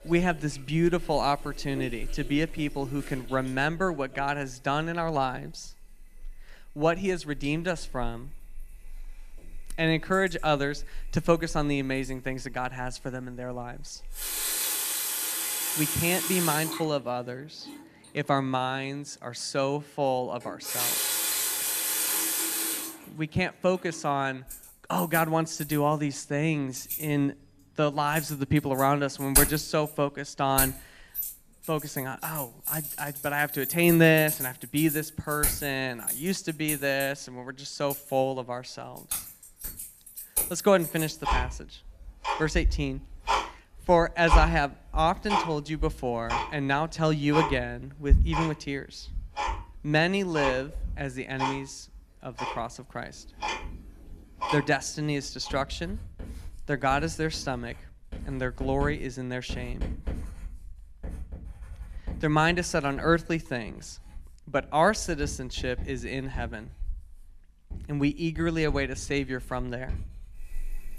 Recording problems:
household noises; loud; throughout; 3 dB below the speech

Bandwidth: 14.5 kHz